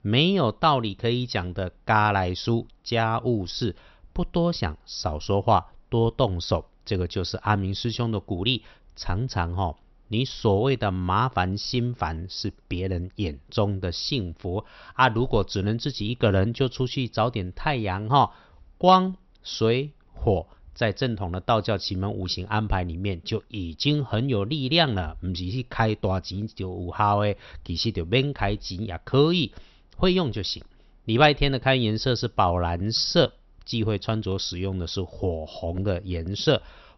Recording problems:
high frequencies cut off; noticeable; nothing above 6 kHz

